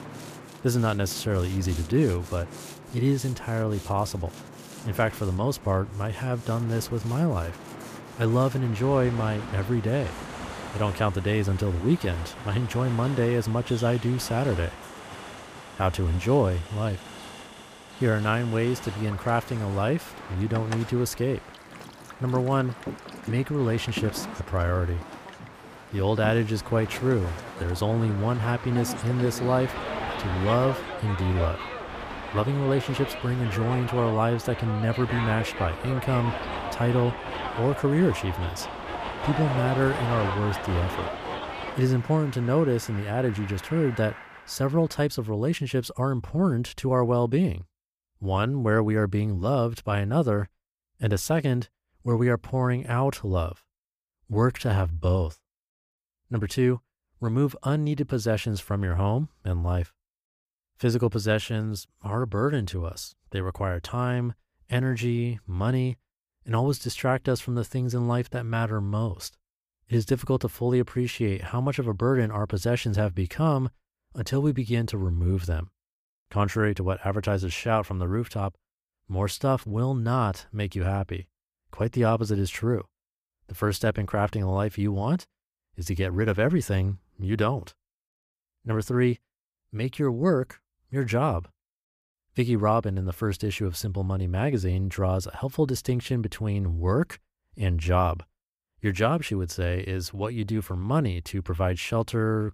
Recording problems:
train or aircraft noise; noticeable; until 45 s; 10 dB below the speech

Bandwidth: 15 kHz